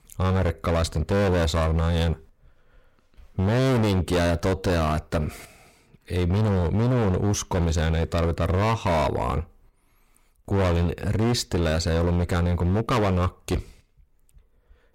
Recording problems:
distortion; heavy; 23% of the sound clipped

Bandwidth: 16 kHz